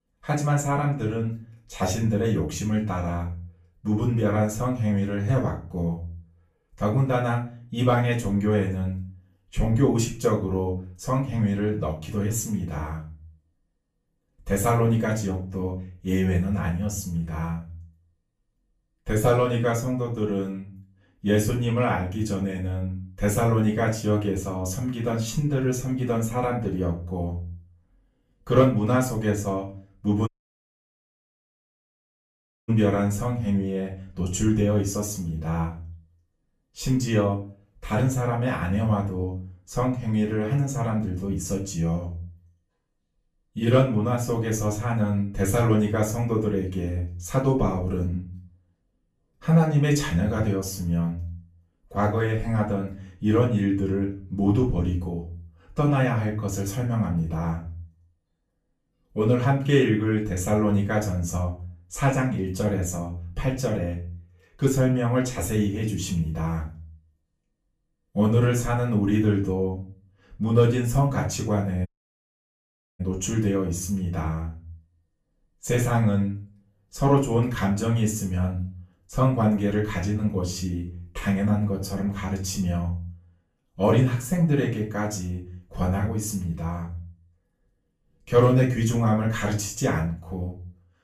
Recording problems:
off-mic speech; far
room echo; slight; dies away in 0.3 s
audio cutting out; at 30 s for 2.5 s and at 1:12 for 1 s

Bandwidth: 14.5 kHz